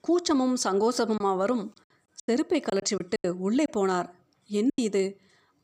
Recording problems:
choppy; very; 8% of the speech affected

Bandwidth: 15 kHz